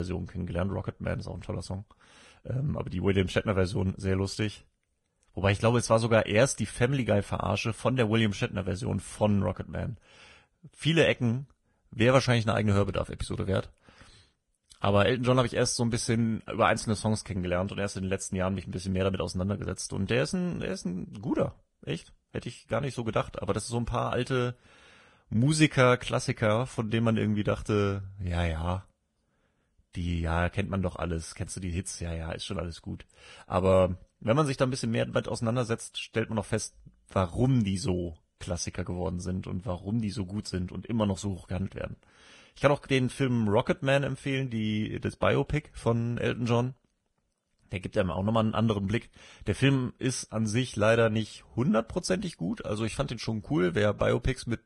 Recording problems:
garbled, watery; badly; nothing above 10 kHz
abrupt cut into speech; at the start

